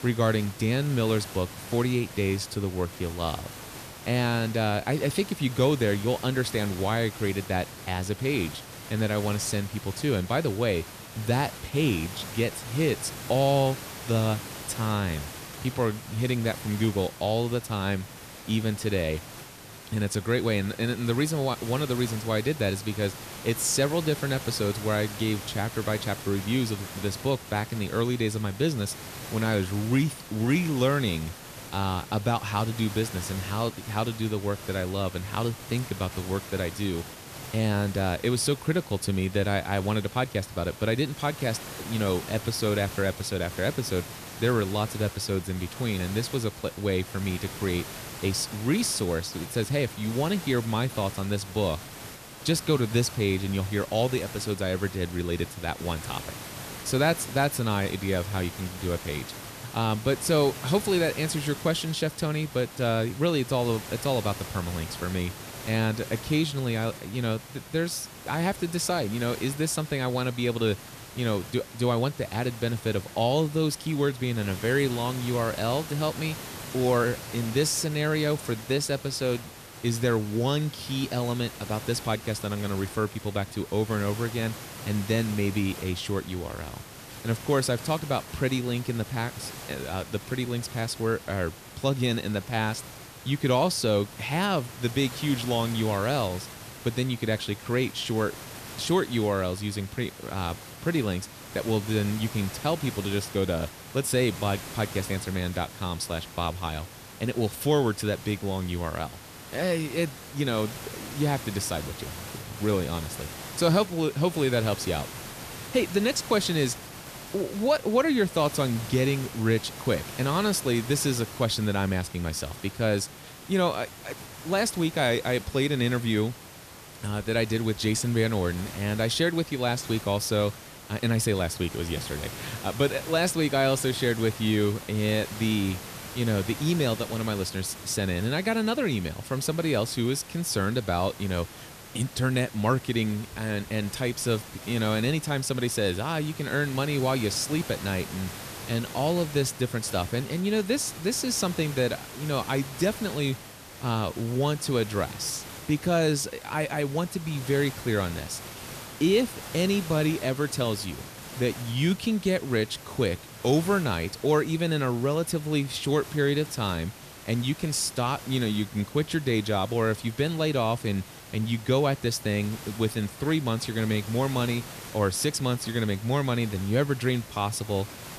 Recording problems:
hiss; noticeable; throughout; 10 dB below the speech

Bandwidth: 14.5 kHz